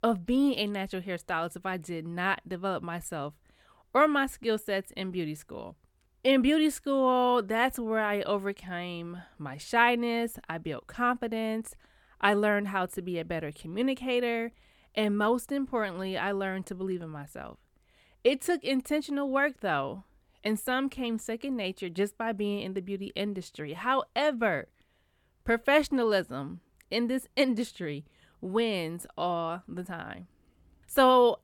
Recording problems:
none

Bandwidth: 18 kHz